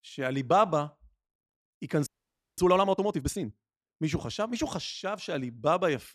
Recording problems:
audio freezing; at 2 s for 0.5 s

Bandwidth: 13.5 kHz